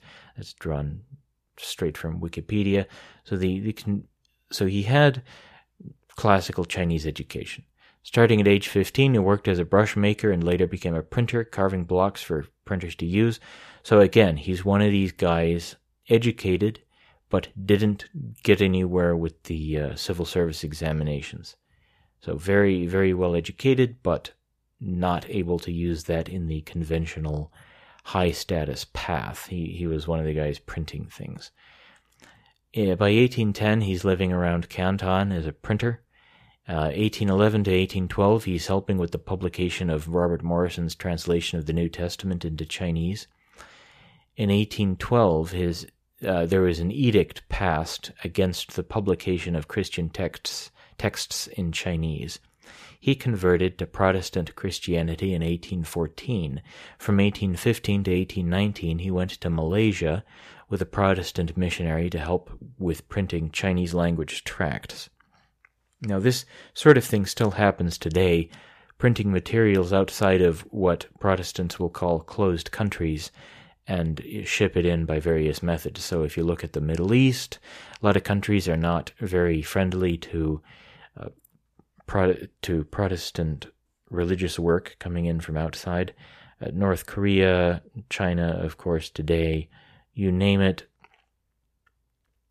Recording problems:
none

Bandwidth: 14.5 kHz